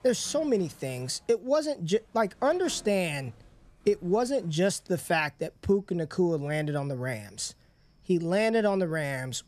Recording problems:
animal sounds; faint; throughout; 30 dB below the speech

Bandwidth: 13.5 kHz